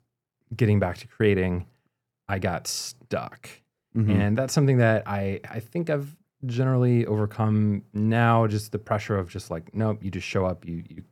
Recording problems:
none

